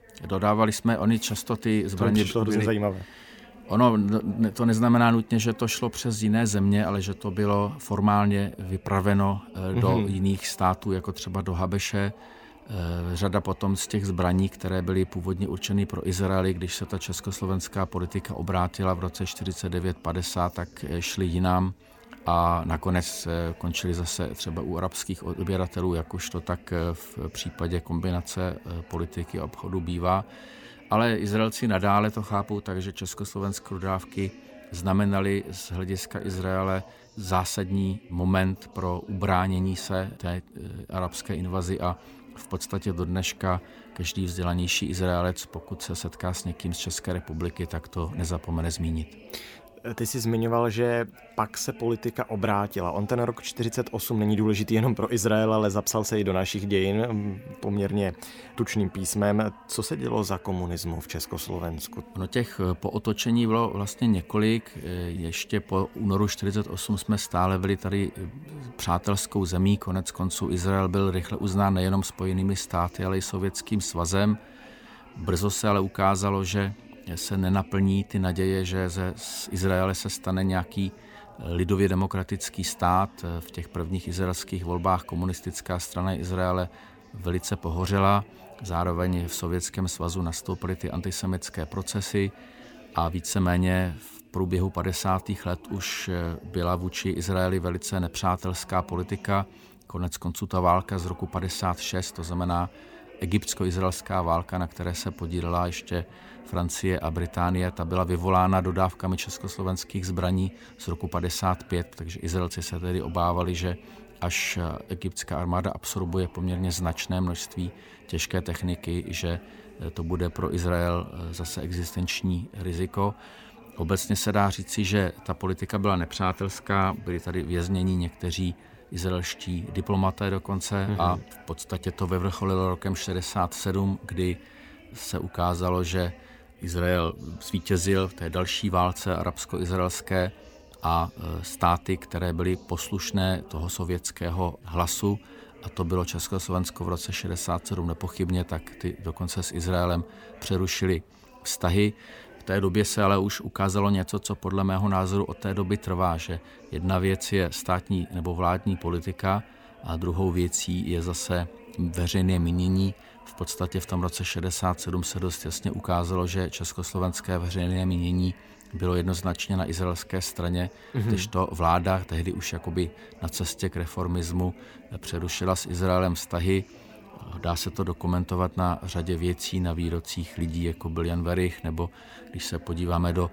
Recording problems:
background chatter; faint; throughout; 3 voices, 20 dB below the speech

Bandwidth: 19 kHz